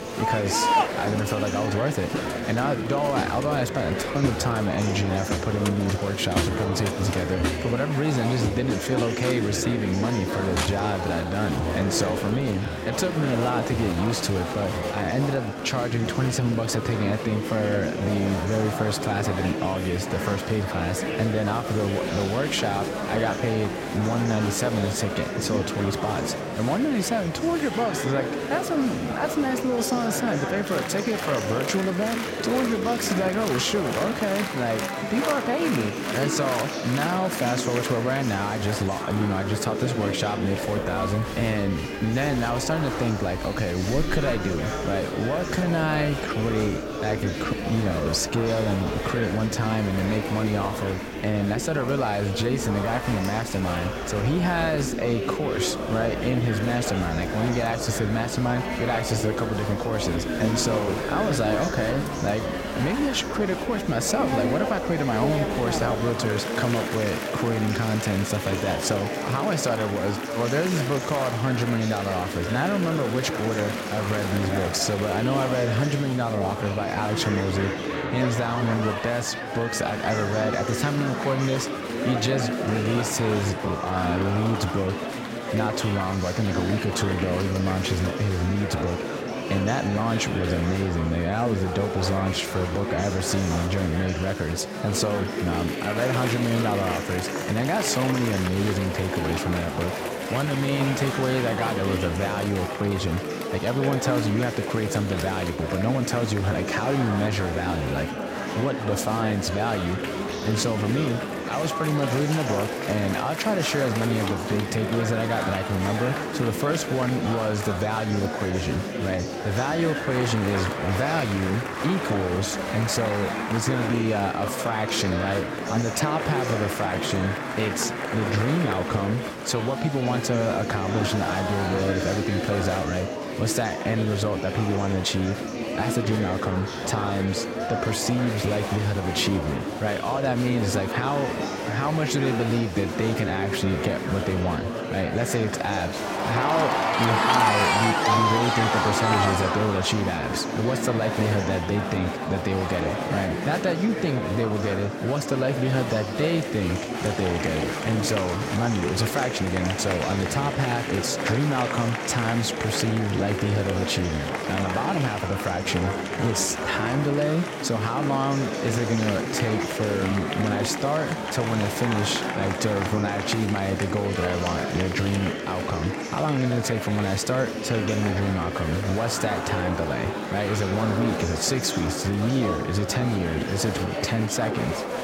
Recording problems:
murmuring crowd; loud; throughout; 2 dB below the speech

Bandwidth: 16 kHz